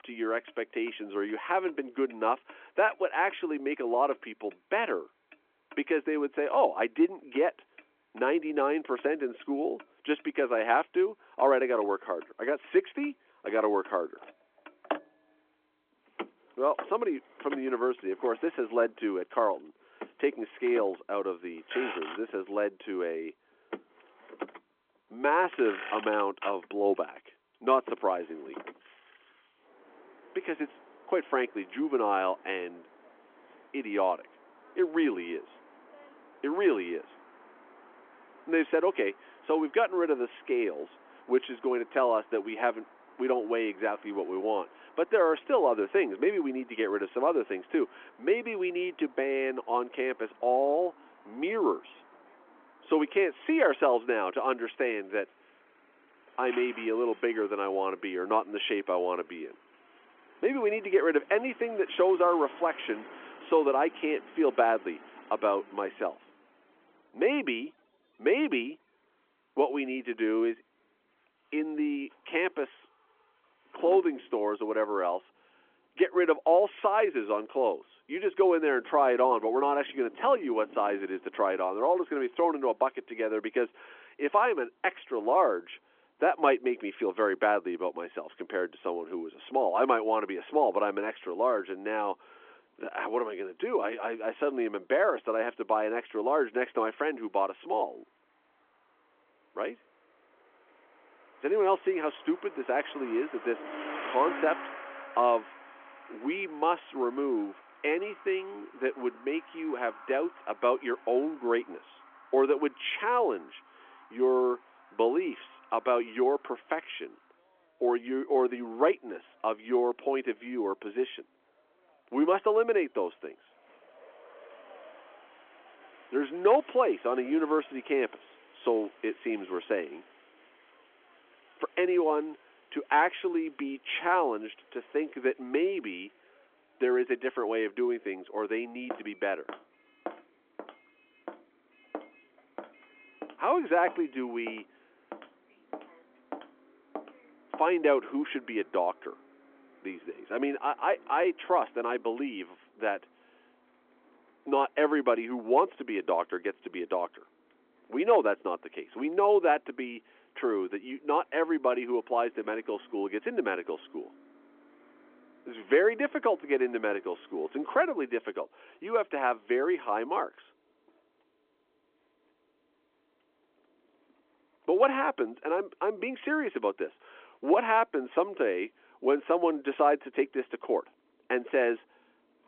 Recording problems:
phone-call audio
traffic noise; faint; throughout; 20 dB below the speech
footsteps; faint; from 2:19 to 2:28; peak 15 dB below the speech

